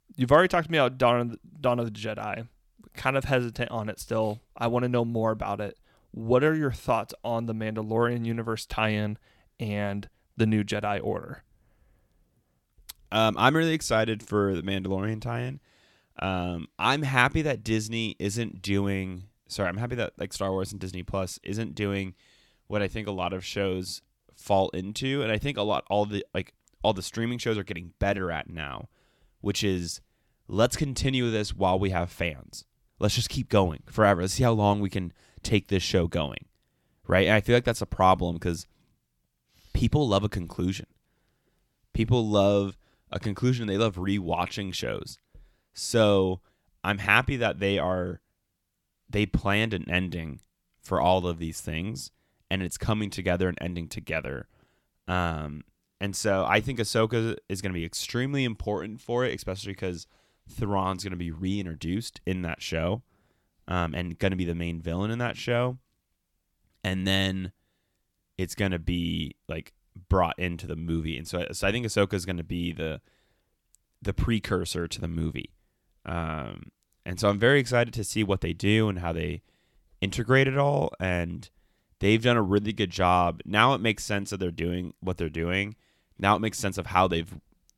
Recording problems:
none

